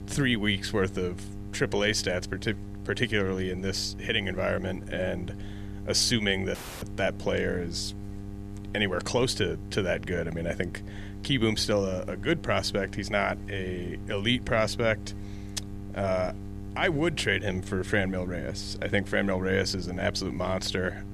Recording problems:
electrical hum; noticeable; throughout; 50 Hz, 20 dB below the speech
audio cutting out; at 6.5 s

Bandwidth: 14 kHz